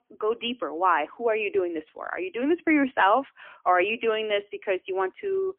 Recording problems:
phone-call audio; poor line; nothing above 3 kHz

